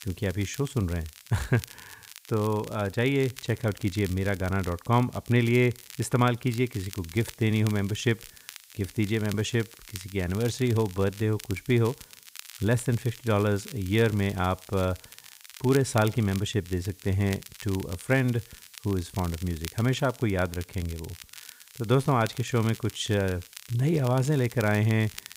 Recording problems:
crackle, like an old record; noticeable; 15 dB below the speech
hiss; faint; throughout; 25 dB below the speech

